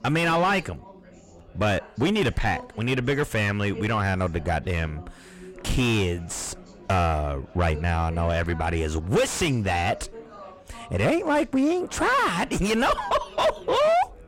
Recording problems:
distortion; heavy; 5 dB below the speech
chatter from many people; faint; throughout; 20 dB below the speech

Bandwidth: 16 kHz